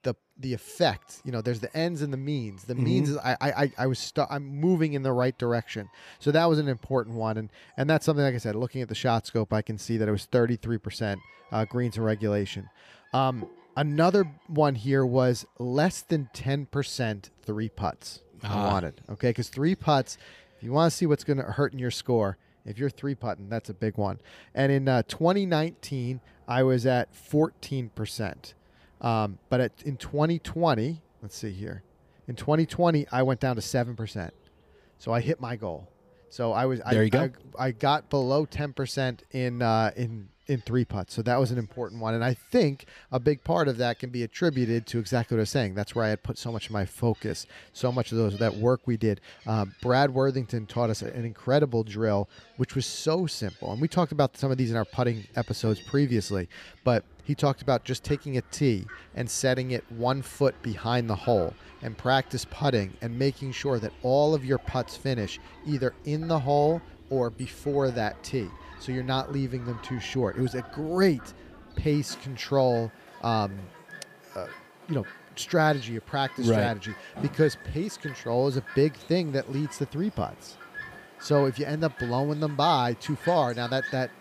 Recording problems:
animal sounds; noticeable; throughout; 20 dB below the speech

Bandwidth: 15 kHz